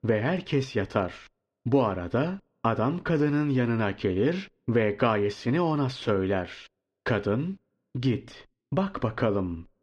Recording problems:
muffled; very slightly; fading above 3.5 kHz

